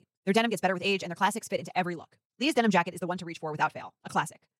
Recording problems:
wrong speed, natural pitch; too fast; 1.8 times normal speed

